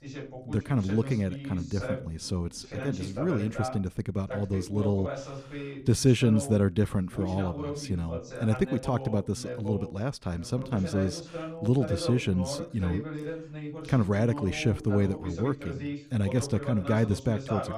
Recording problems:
voice in the background; loud; throughout; 9 dB below the speech

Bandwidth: 14.5 kHz